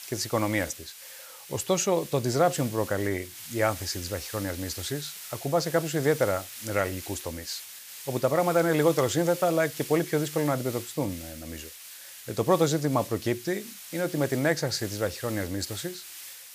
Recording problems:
hiss; noticeable; throughout; 10 dB below the speech

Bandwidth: 15 kHz